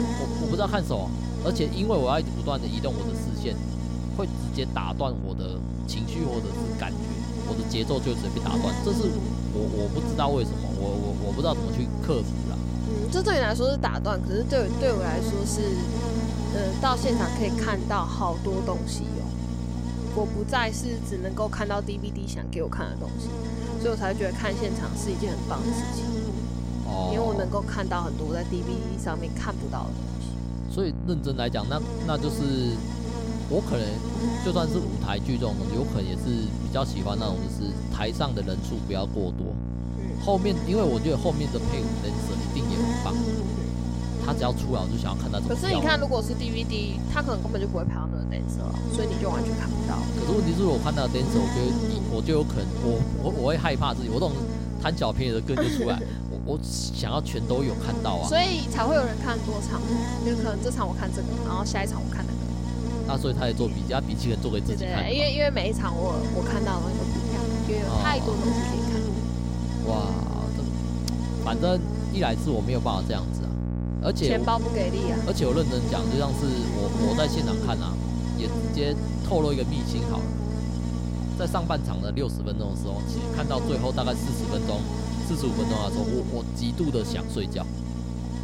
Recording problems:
electrical hum; loud; throughout; 60 Hz, 5 dB below the speech

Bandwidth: 16 kHz